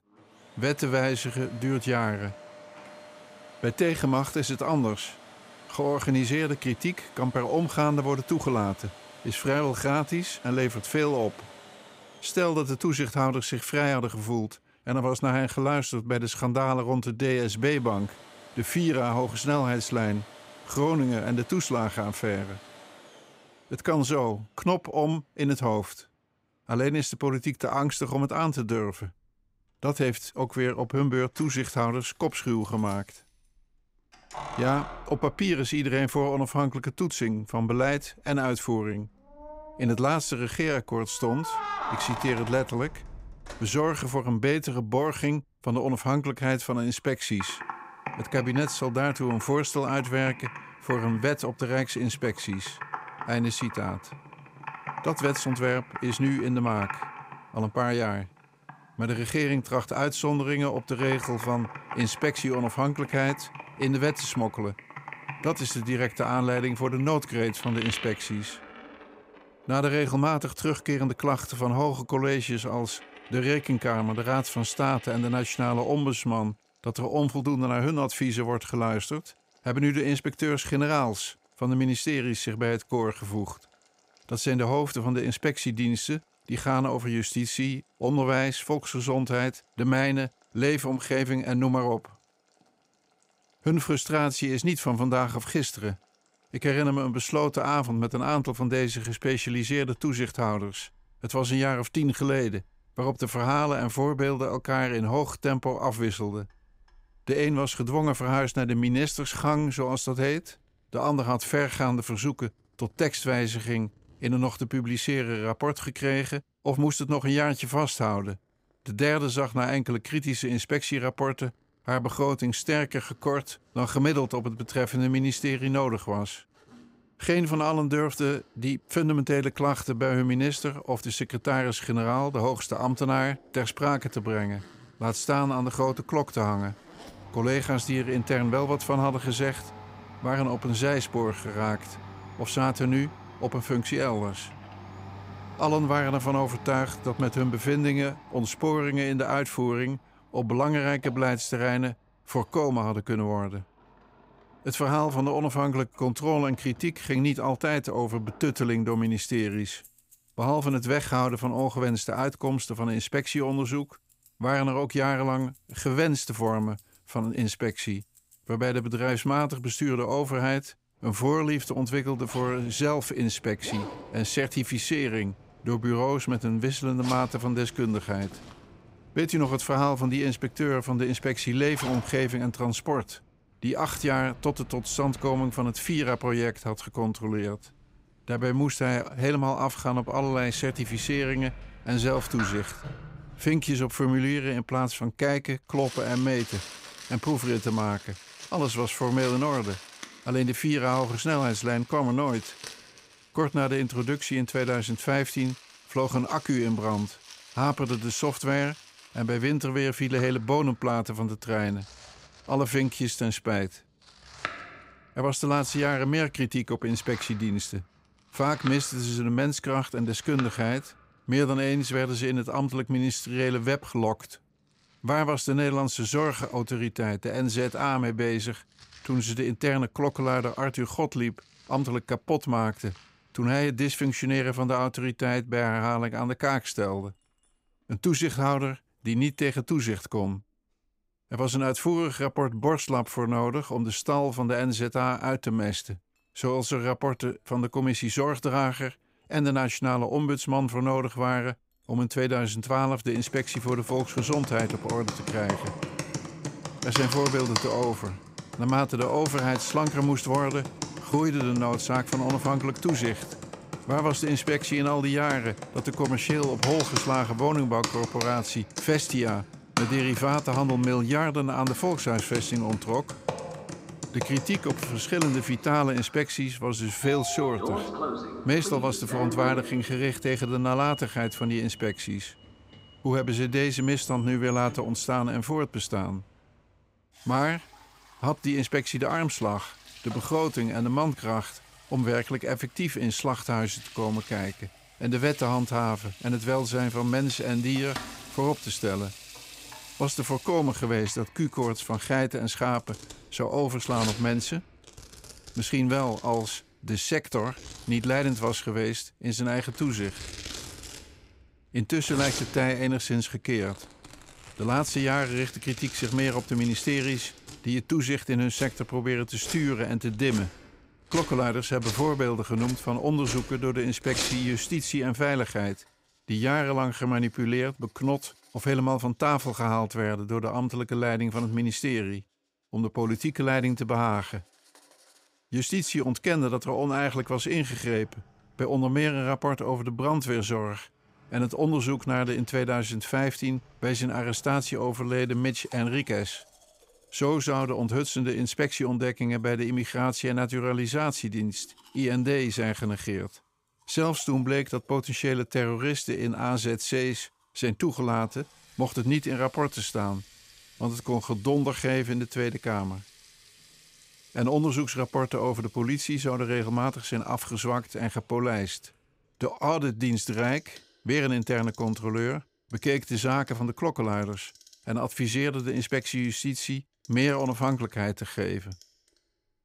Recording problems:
household noises; noticeable; throughout; 15 dB below the speech

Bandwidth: 15.5 kHz